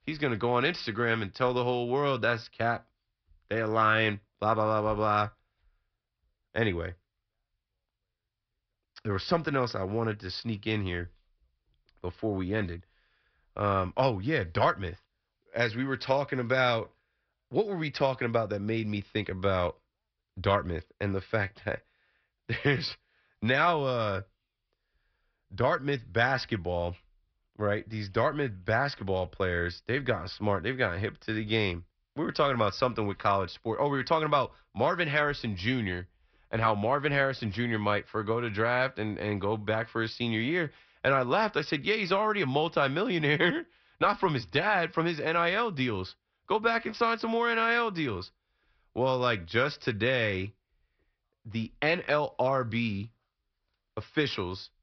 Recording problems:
high frequencies cut off; noticeable; nothing above 5.5 kHz

